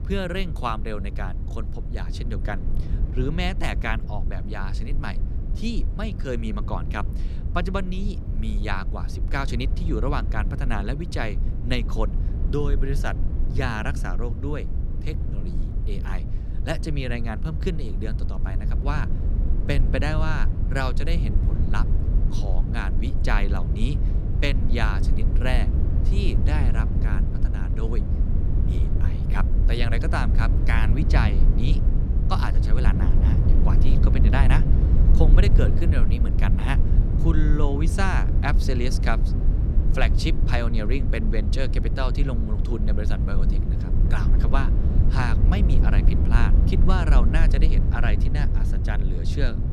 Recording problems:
low rumble; loud; throughout; 7 dB below the speech

